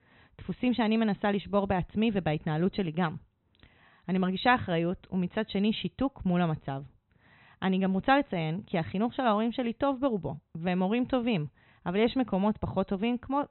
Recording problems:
high frequencies cut off; severe; nothing above 4 kHz

